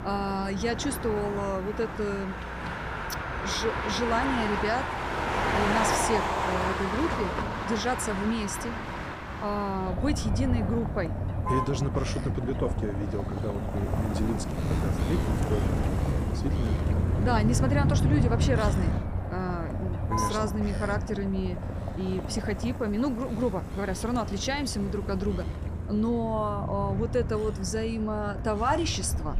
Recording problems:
traffic noise; very loud; throughout; as loud as the speech

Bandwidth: 15 kHz